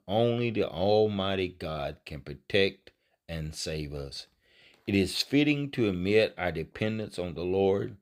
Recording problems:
none

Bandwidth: 15.5 kHz